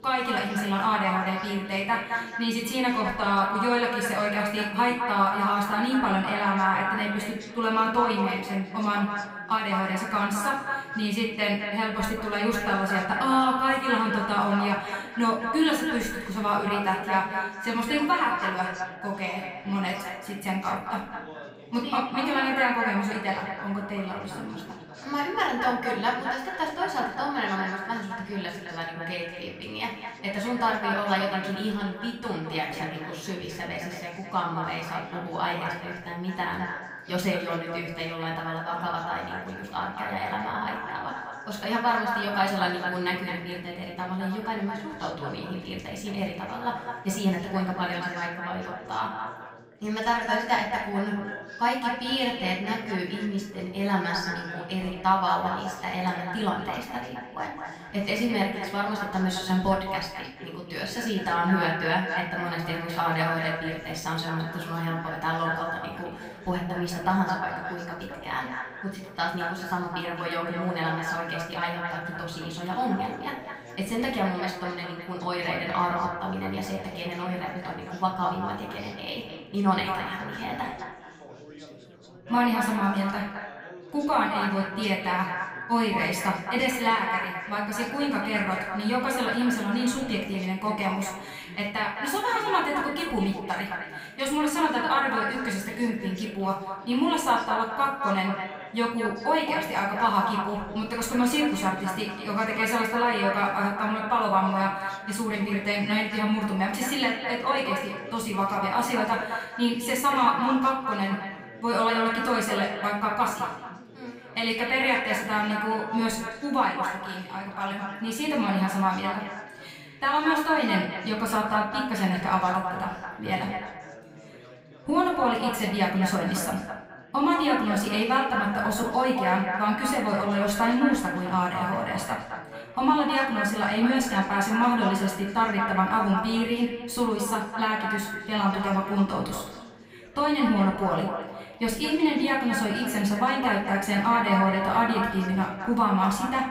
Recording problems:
echo of what is said; strong; throughout; 210 ms later, 6 dB below the speech
off-mic speech; far
room echo; slight; dies away in 0.4 s
chatter from many people; noticeable; throughout; 20 dB below the speech

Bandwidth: 15.5 kHz